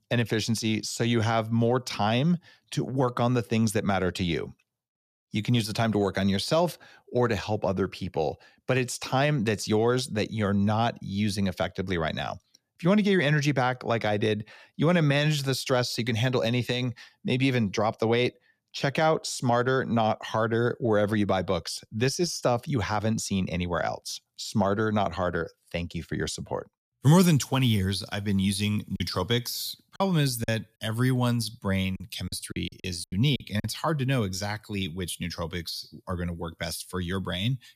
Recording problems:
choppy; very; from 29 to 34 s; 11% of the speech affected

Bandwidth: 14.5 kHz